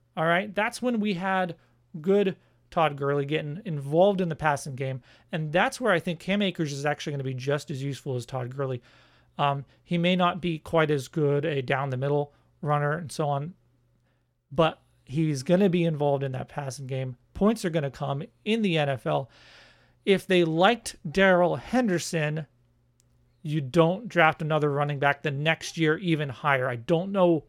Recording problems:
none

